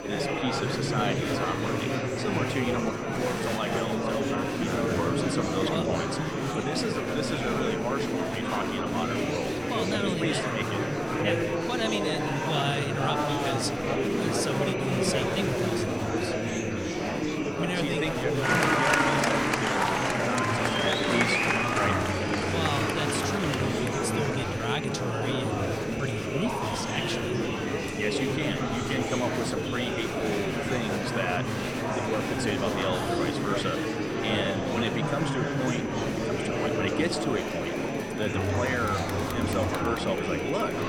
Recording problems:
murmuring crowd; very loud; throughout; 5 dB above the speech
high-pitched whine; noticeable; throughout; 6 kHz, 20 dB below the speech

